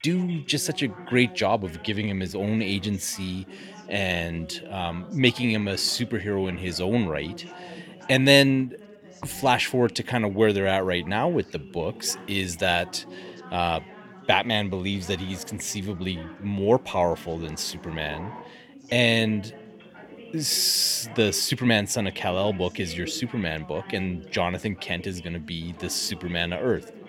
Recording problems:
background chatter; noticeable; throughout; 3 voices, 20 dB below the speech

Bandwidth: 17 kHz